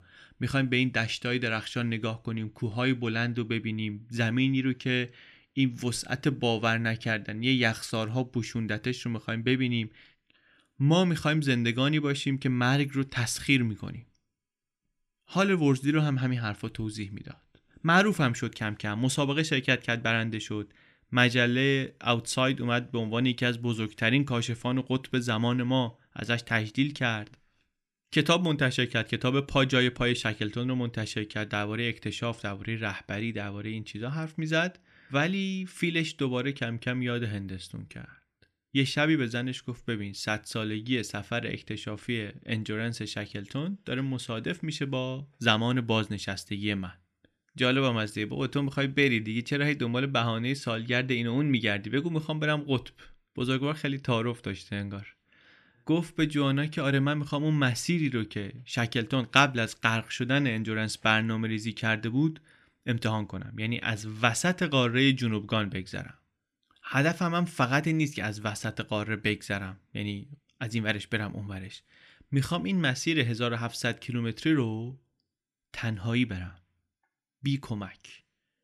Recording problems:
none

